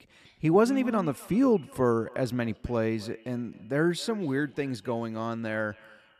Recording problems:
echo of what is said; faint; throughout; 260 ms later, 25 dB below the speech

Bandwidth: 14 kHz